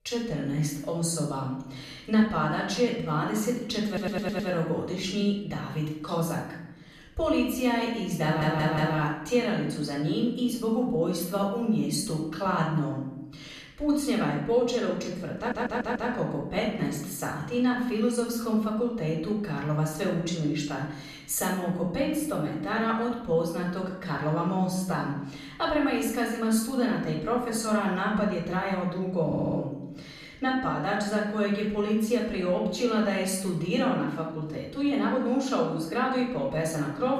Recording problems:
off-mic speech; far
room echo; noticeable; dies away in 0.8 s
audio stuttering; 4 times, first at 4 s

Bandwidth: 14.5 kHz